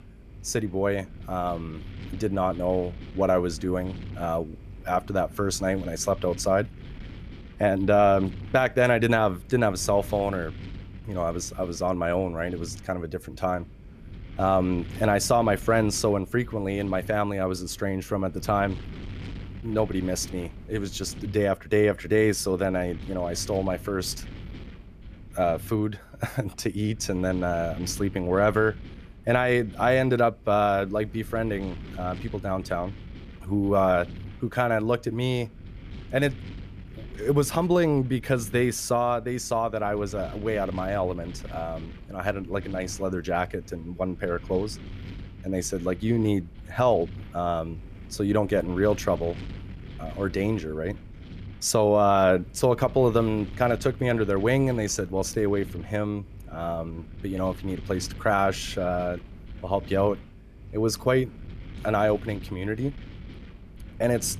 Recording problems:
wind noise on the microphone; occasional gusts; 25 dB below the speech

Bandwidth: 14.5 kHz